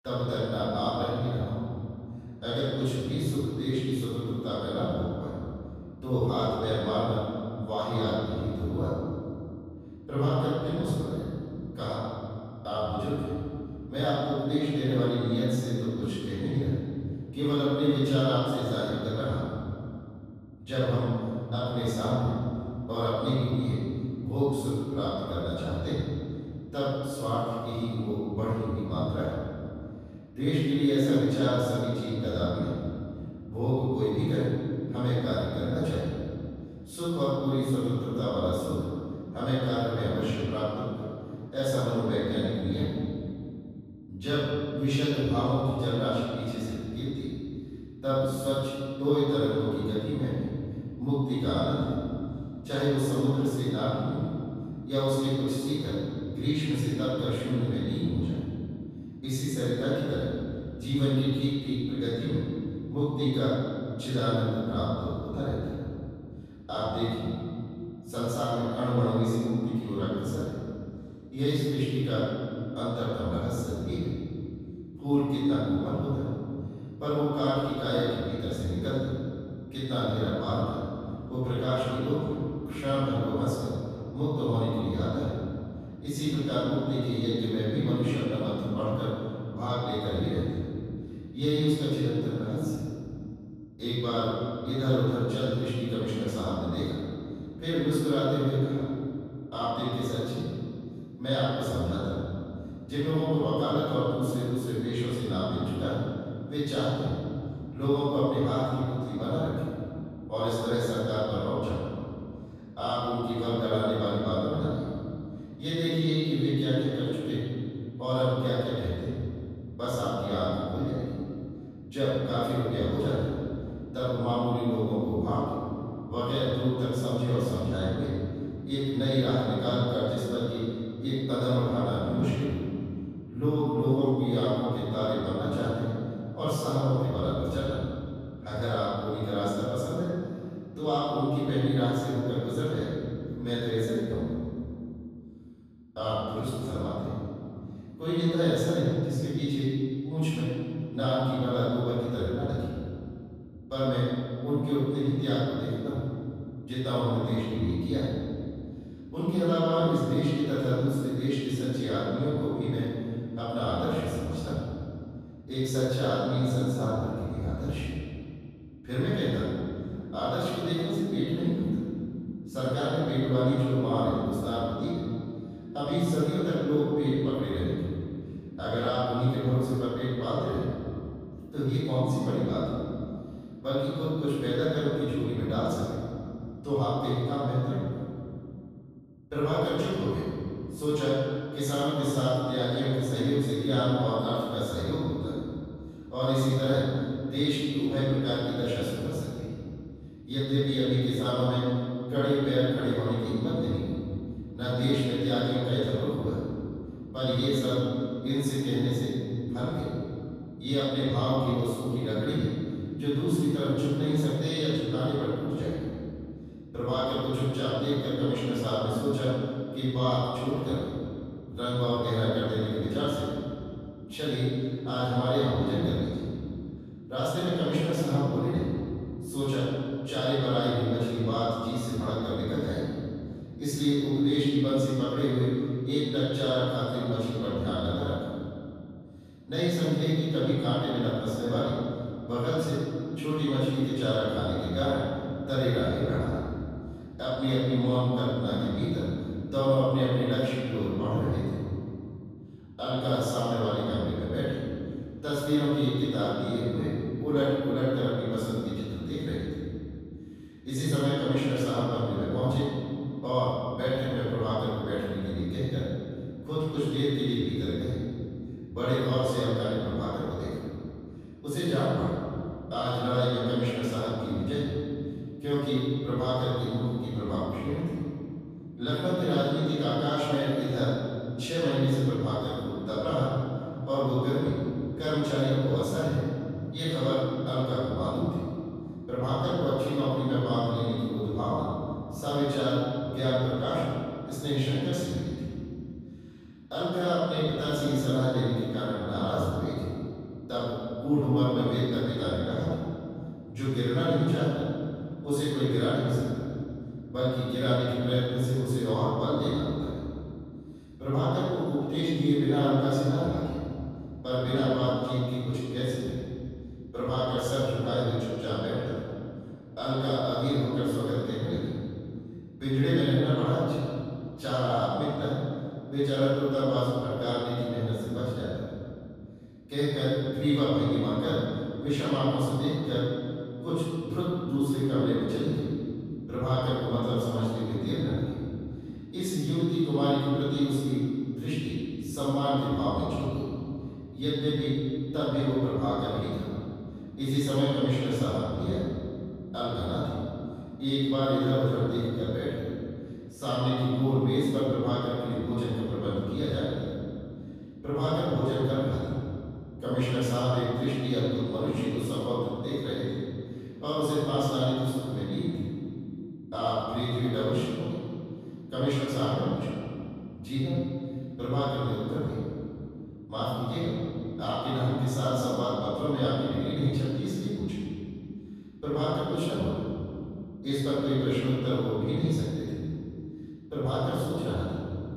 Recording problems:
room echo; strong; dies away in 2.7 s
off-mic speech; far

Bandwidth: 14.5 kHz